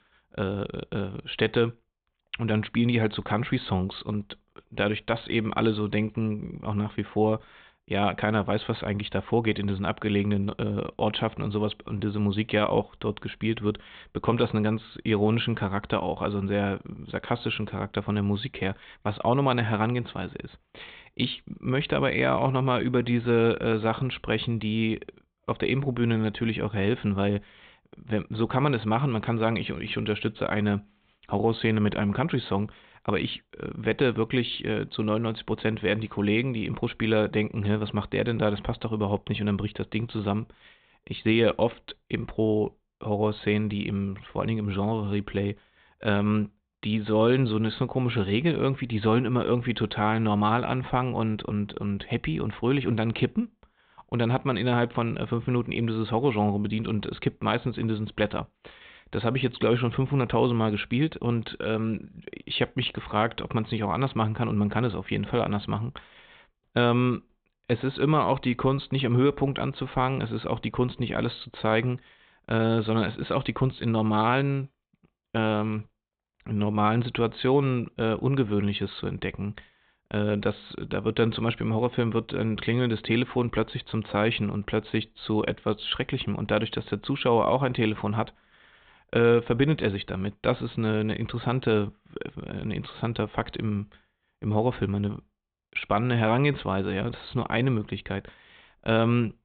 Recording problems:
high frequencies cut off; severe; nothing above 4 kHz

